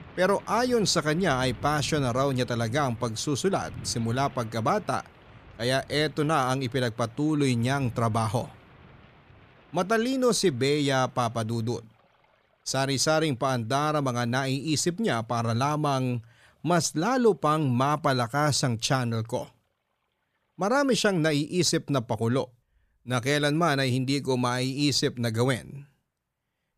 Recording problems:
rain or running water; faint; throughout; 20 dB below the speech

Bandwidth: 14.5 kHz